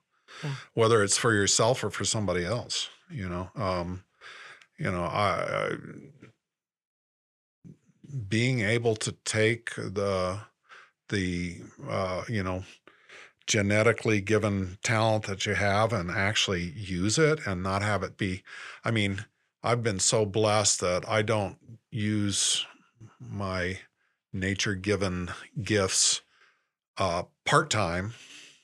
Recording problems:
none

